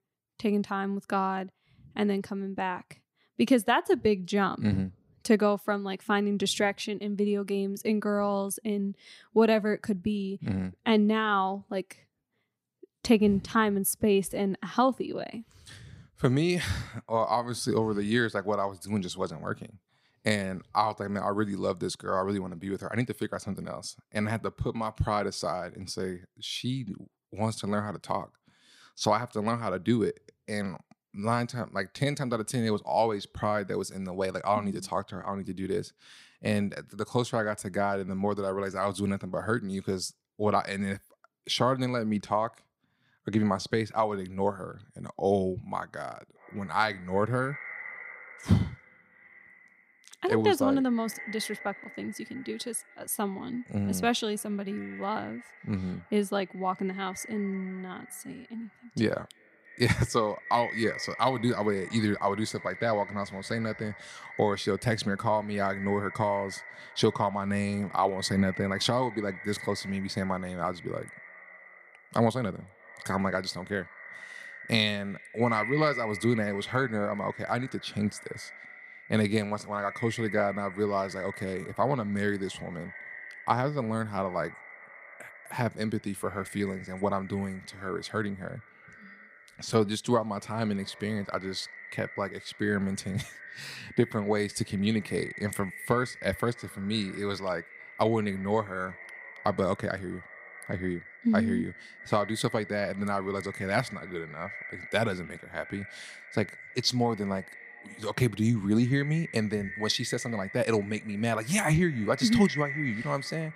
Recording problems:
echo of what is said; noticeable; from 46 s on; 310 ms later, 15 dB below the speech

